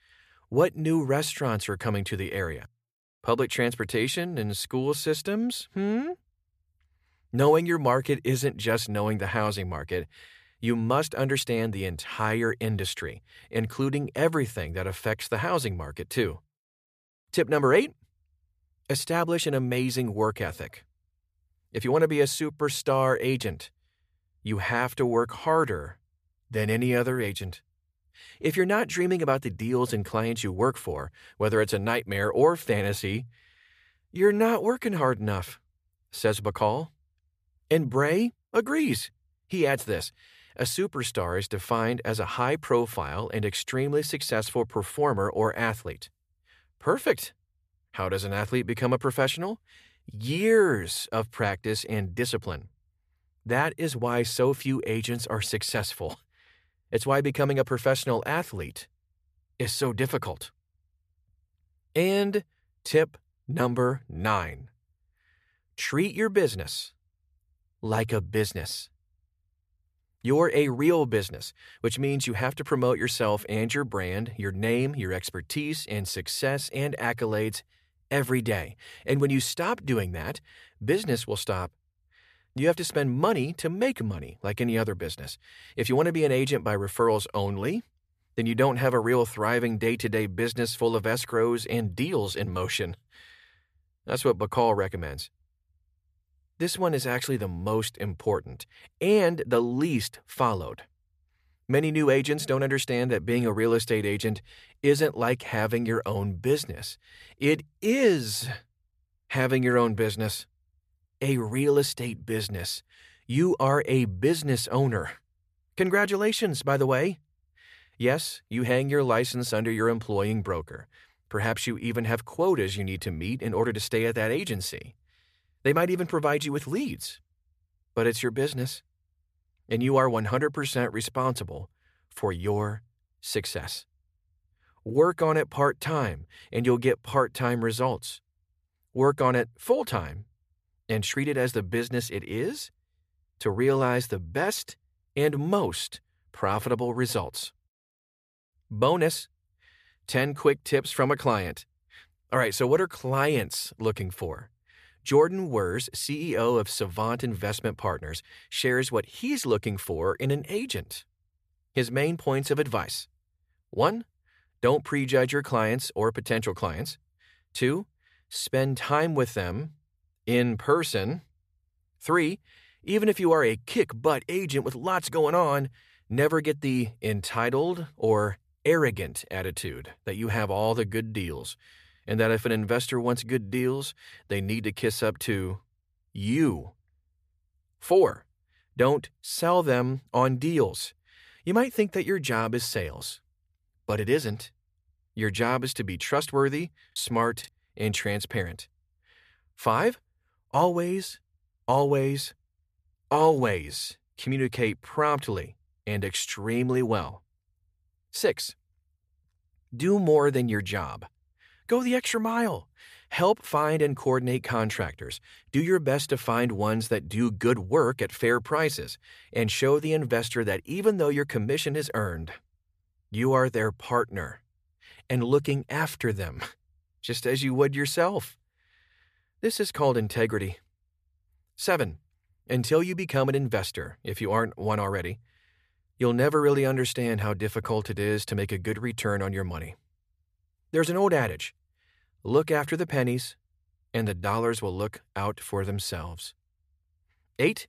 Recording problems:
choppy; occasionally; at 3:17; 3% of the speech affected

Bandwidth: 14.5 kHz